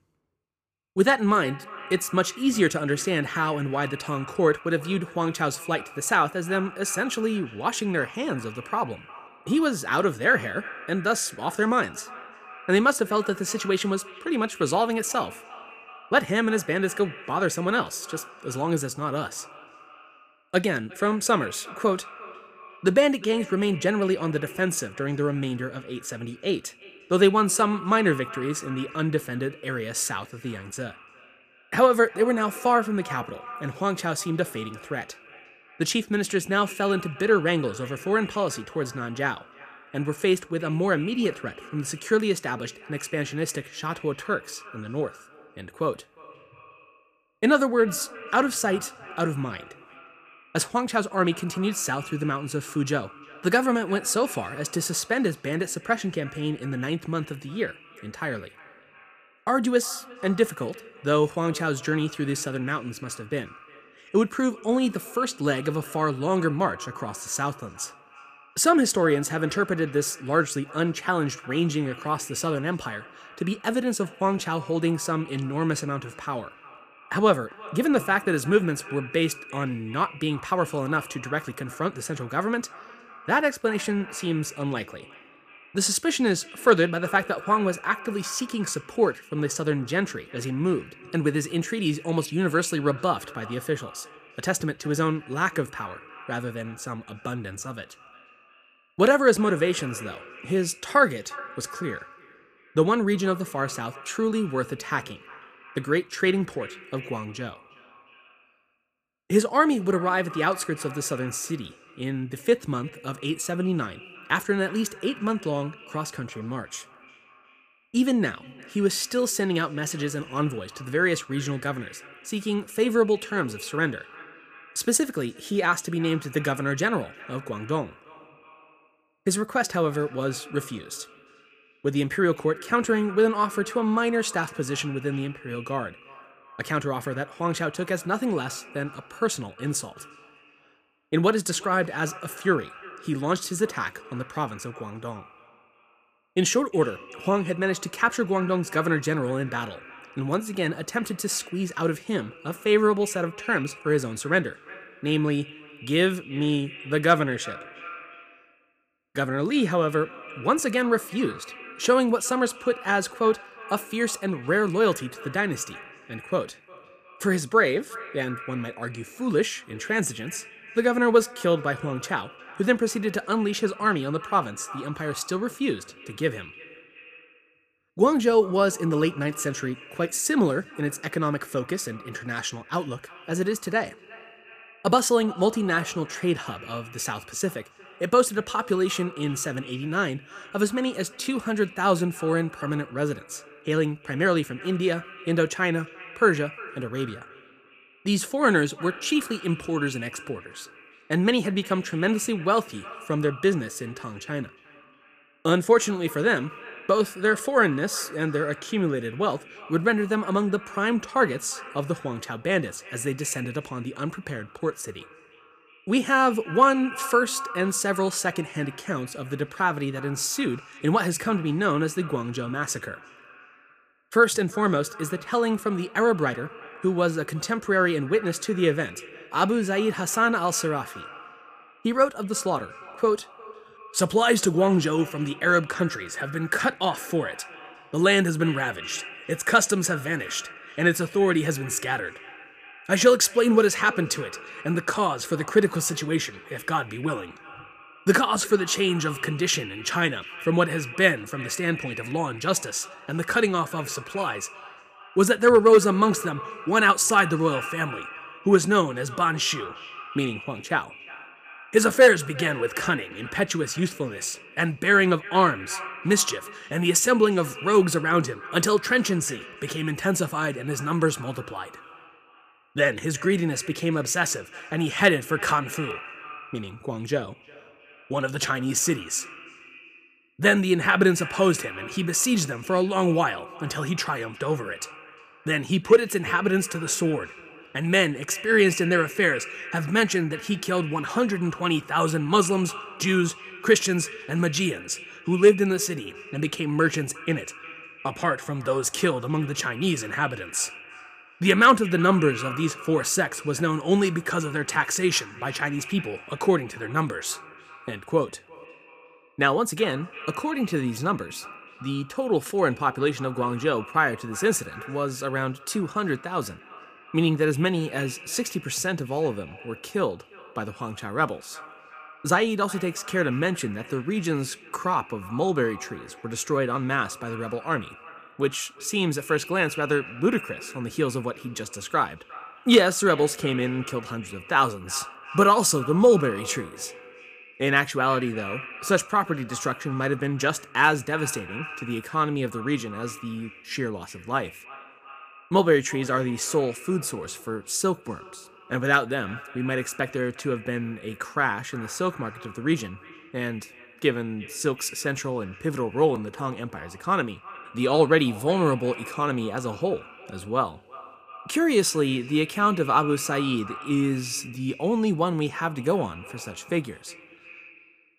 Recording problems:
echo of what is said; noticeable; throughout; 360 ms later, 15 dB below the speech

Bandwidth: 15 kHz